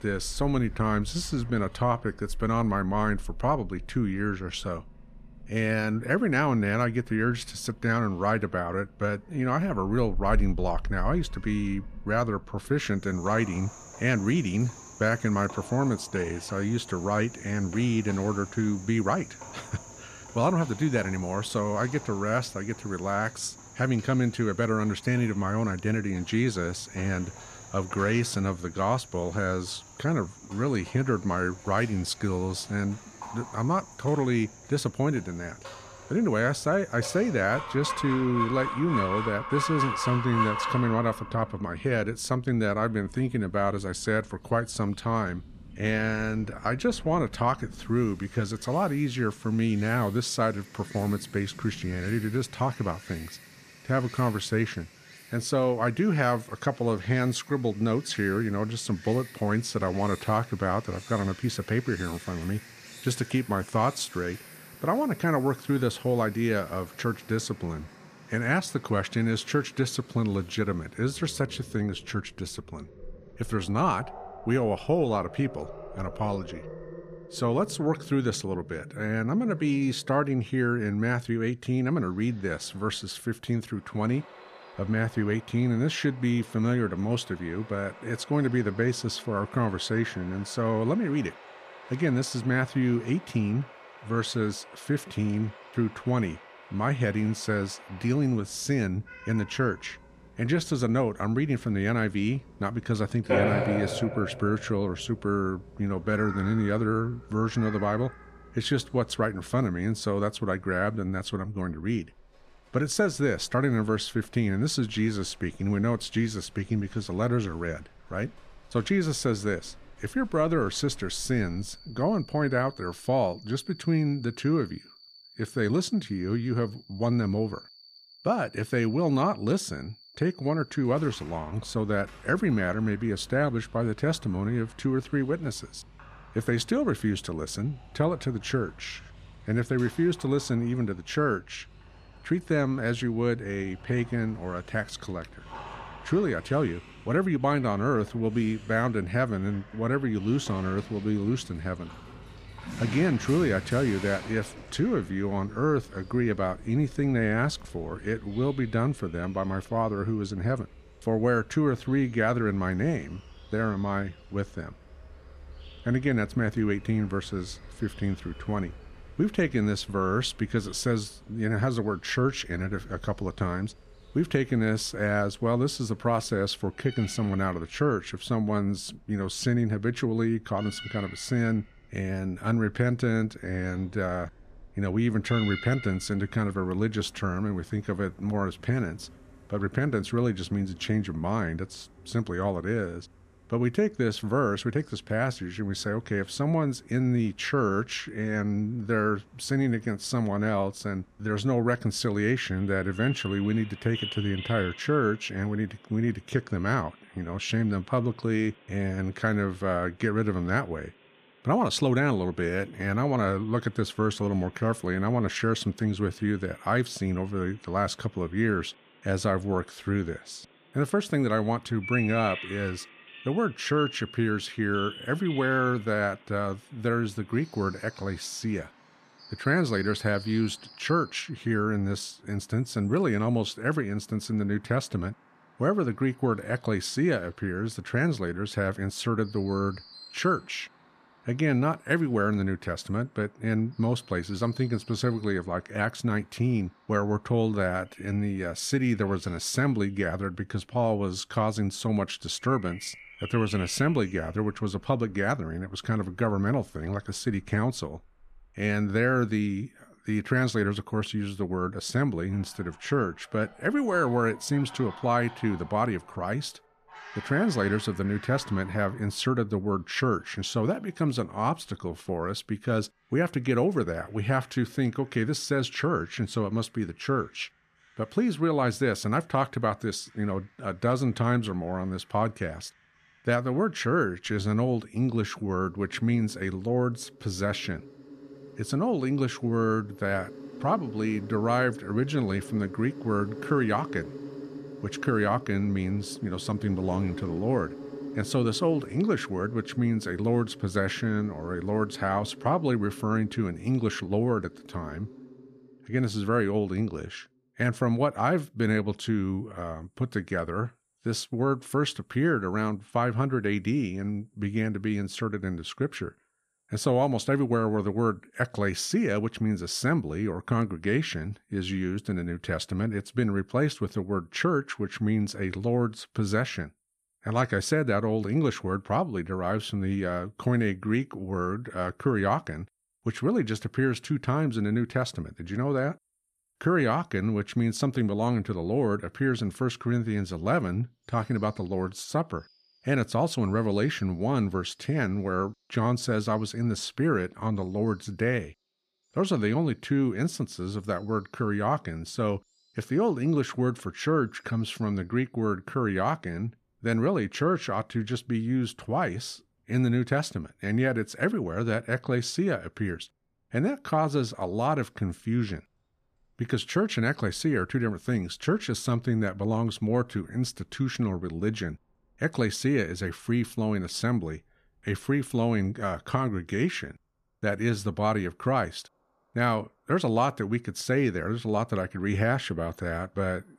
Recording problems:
animal sounds; noticeable; throughout; 15 dB below the speech

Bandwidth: 14.5 kHz